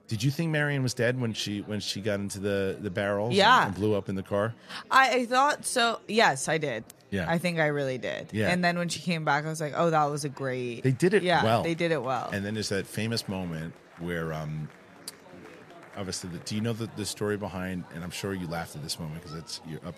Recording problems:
murmuring crowd; faint; throughout; 25 dB below the speech

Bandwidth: 14.5 kHz